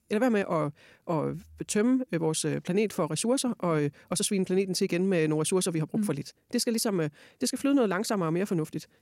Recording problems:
wrong speed, natural pitch; too fast; 1.5 times normal speed

